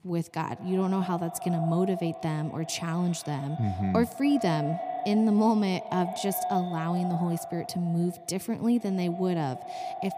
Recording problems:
echo of what is said; strong; throughout; 100 ms later, 9 dB below the speech

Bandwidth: 15 kHz